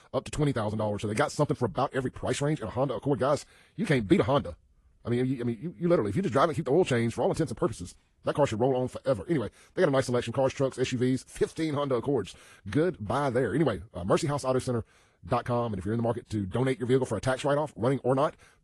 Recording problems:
wrong speed, natural pitch; too fast; 1.5 times normal speed
garbled, watery; slightly; nothing above 11 kHz

